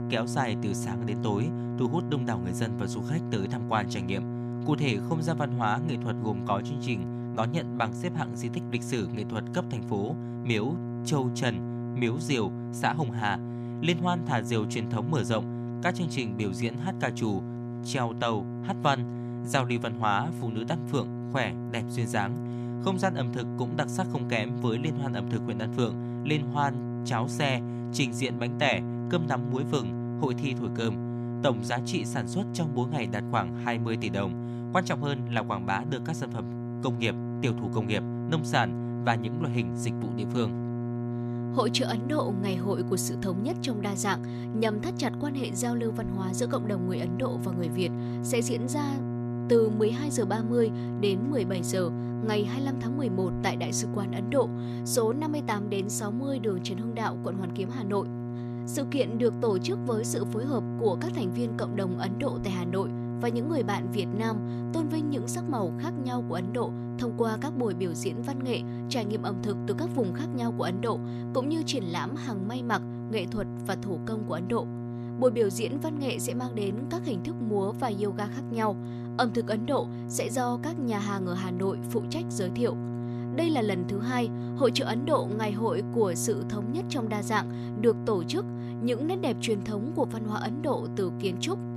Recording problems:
electrical hum; loud; throughout; 60 Hz, 8 dB below the speech

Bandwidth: 13.5 kHz